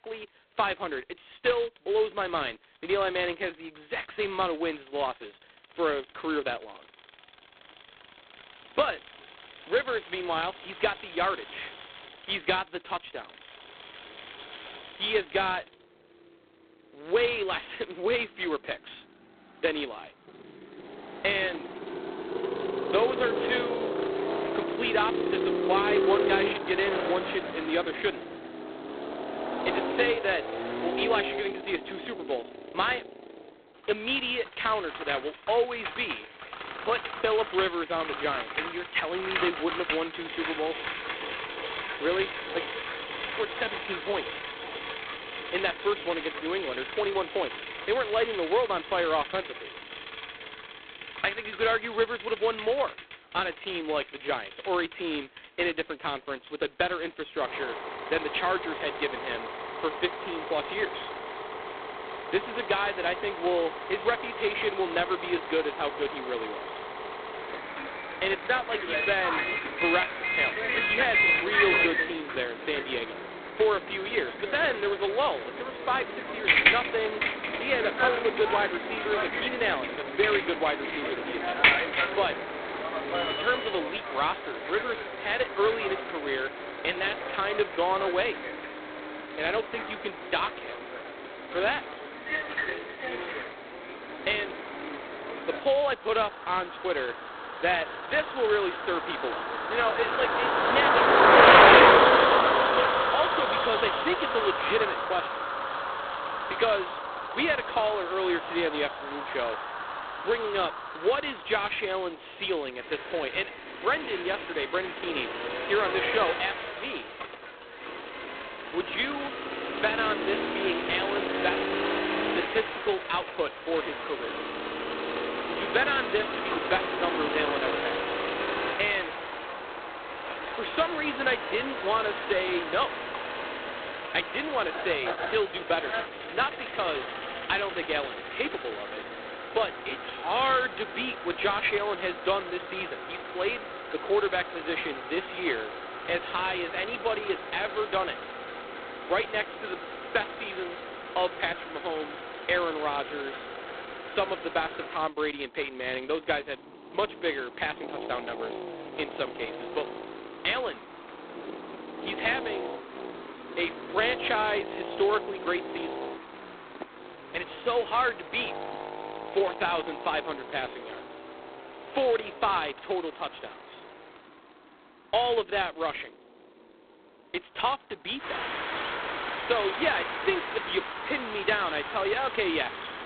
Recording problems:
phone-call audio; poor line; nothing above 4 kHz
traffic noise; loud; throughout; as loud as the speech

